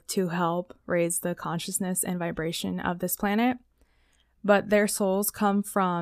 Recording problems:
abrupt cut into speech; at the end

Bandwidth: 14.5 kHz